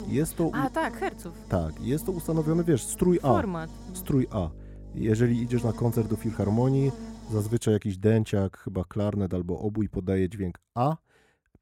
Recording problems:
electrical hum; noticeable; until 7.5 s; 50 Hz, 15 dB below the speech

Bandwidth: 16.5 kHz